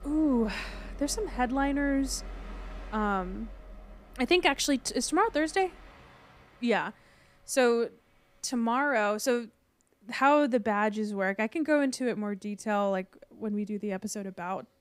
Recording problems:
train or aircraft noise; noticeable; throughout; 20 dB below the speech

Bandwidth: 15.5 kHz